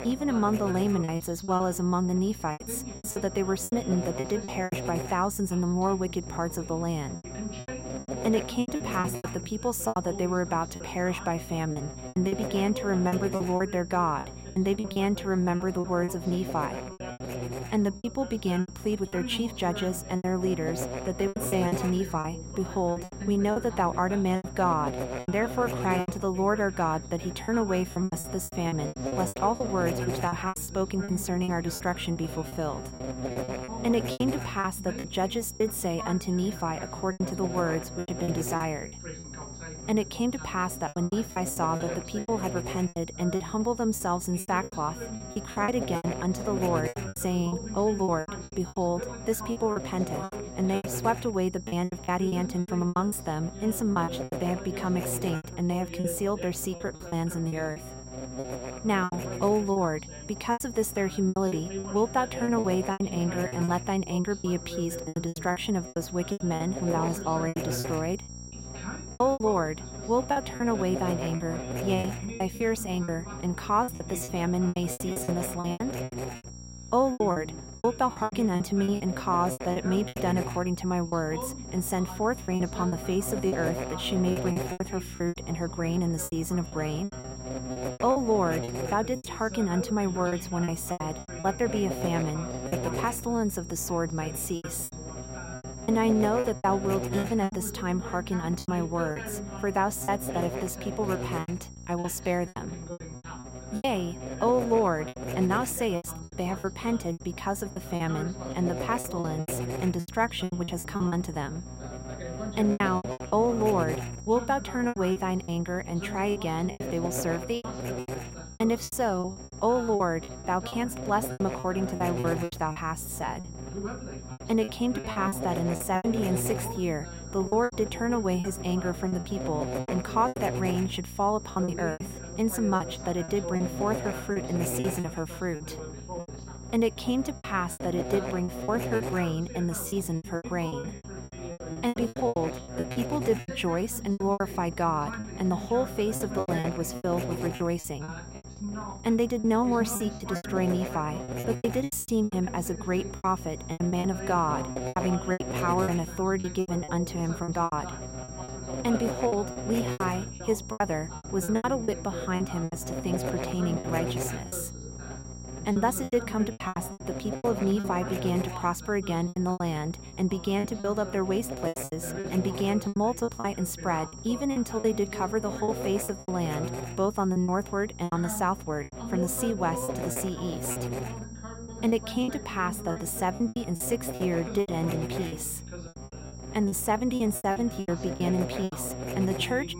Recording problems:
electrical hum; loud; throughout; 60 Hz, 9 dB below the speech
high-pitched whine; noticeable; throughout; 5.5 kHz, 15 dB below the speech
voice in the background; noticeable; throughout; 15 dB below the speech
choppy; very; 13% of the speech affected

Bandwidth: 16 kHz